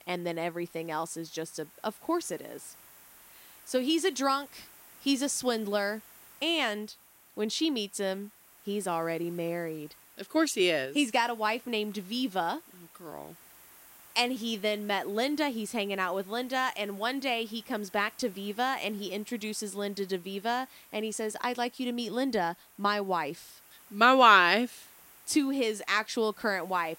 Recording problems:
hiss; faint; throughout; 25 dB below the speech

